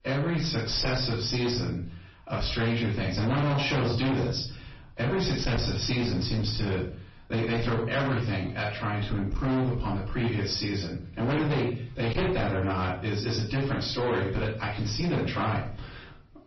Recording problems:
distortion; heavy; 21% of the sound clipped
off-mic speech; far
room echo; noticeable; dies away in 0.4 s
garbled, watery; slightly; nothing above 5.5 kHz

